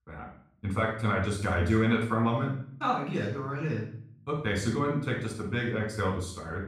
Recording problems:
off-mic speech; far
room echo; noticeable; dies away in 0.5 s

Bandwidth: 15.5 kHz